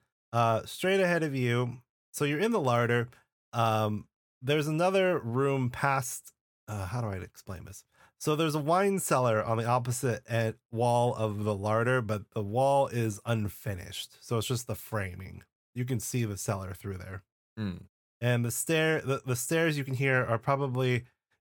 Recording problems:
none

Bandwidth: 17.5 kHz